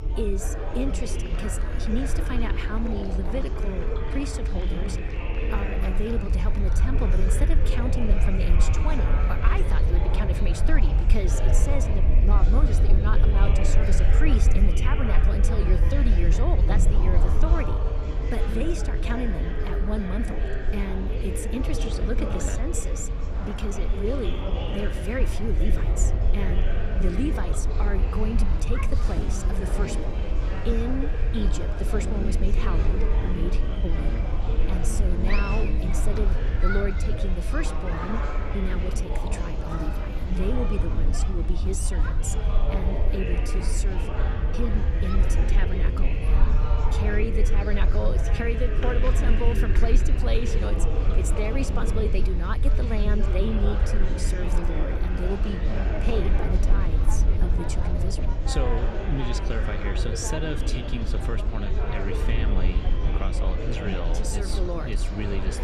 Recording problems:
murmuring crowd; loud; throughout; 2 dB below the speech
low rumble; noticeable; throughout; 10 dB below the speech

